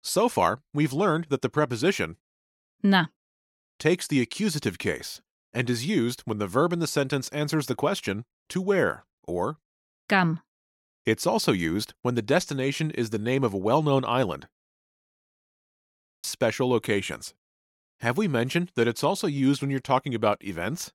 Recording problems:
audio freezing; at 15 s for 1.5 s

